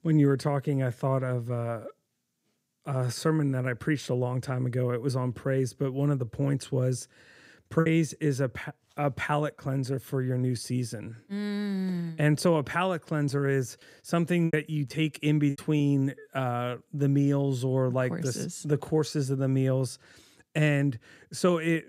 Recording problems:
choppy; occasionally; at 8 s and from 14 to 16 s; 5% of the speech affected

